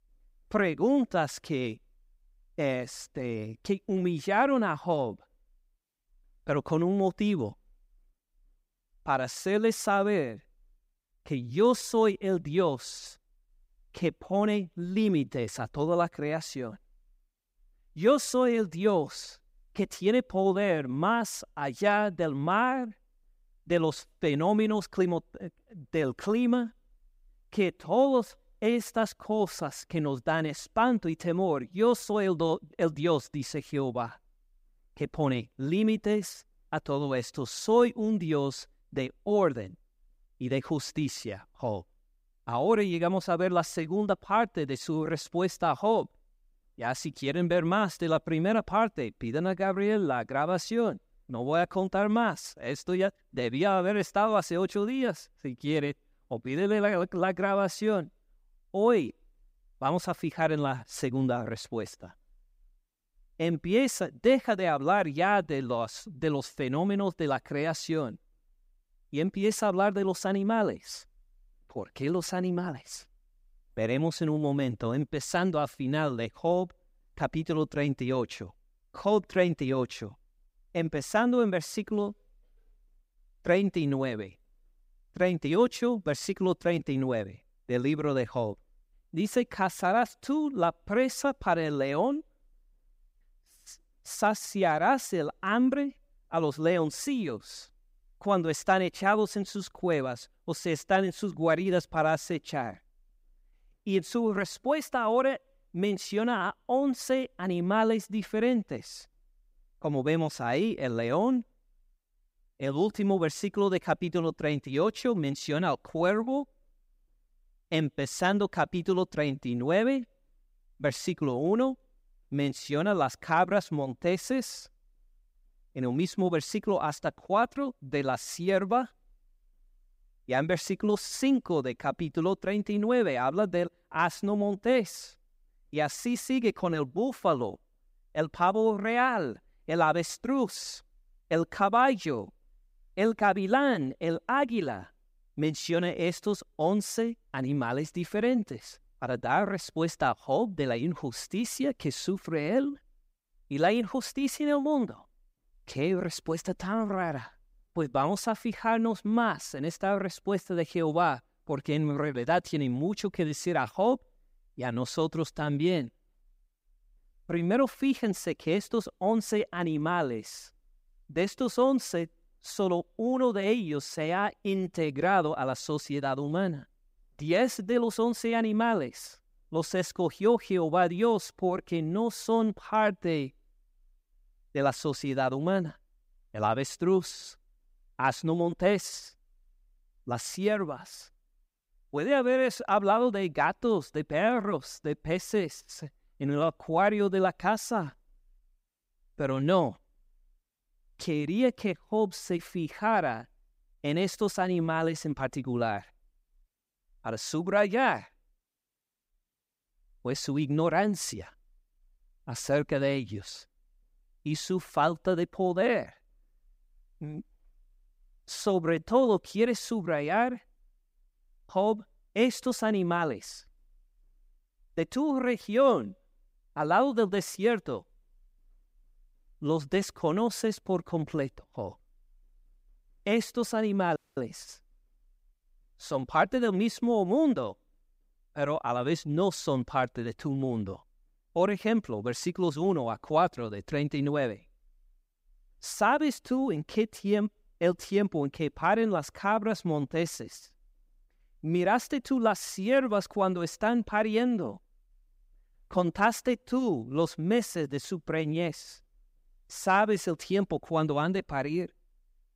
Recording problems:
audio cutting out; at 3:54

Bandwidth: 15.5 kHz